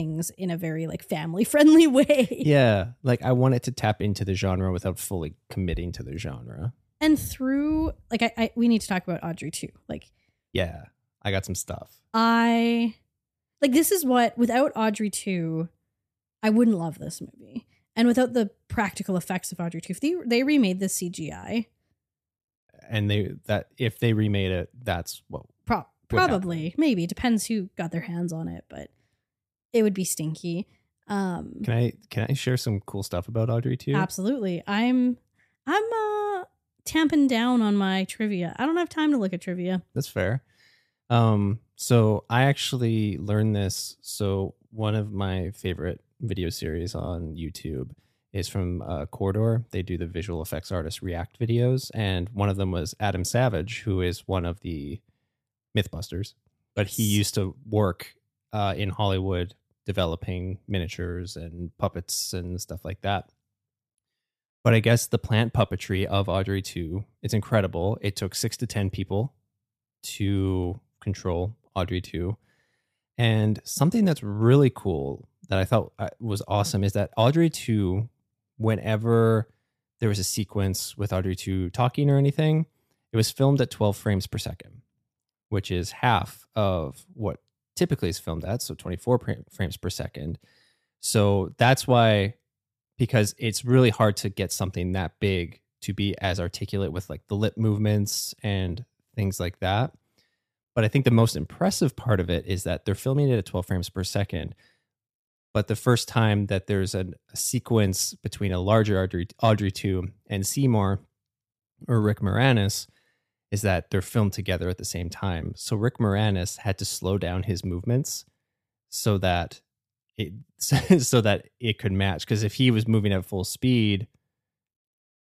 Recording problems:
abrupt cut into speech; at the start

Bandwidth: 14.5 kHz